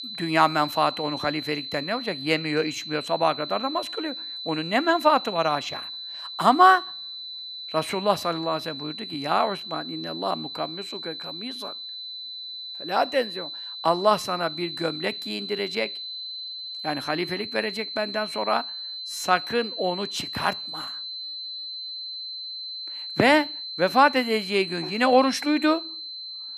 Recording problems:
high-pitched whine; loud; throughout; 4 kHz, 8 dB below the speech

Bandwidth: 14 kHz